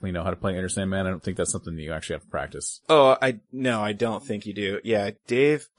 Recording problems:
garbled, watery; slightly; nothing above 10.5 kHz

